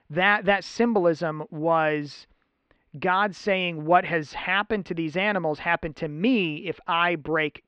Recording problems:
muffled; very; fading above 3.5 kHz

